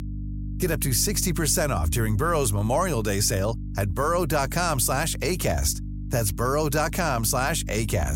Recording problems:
electrical hum; noticeable; throughout; 50 Hz, 20 dB below the speech
abrupt cut into speech; at the end

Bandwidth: 16 kHz